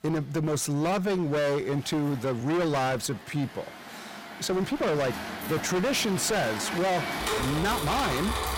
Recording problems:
distortion; heavy; 30% of the sound clipped
traffic noise; loud; throughout; 5 dB below the speech
uneven, jittery; strongly; from 1 to 7.5 s

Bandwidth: 16.5 kHz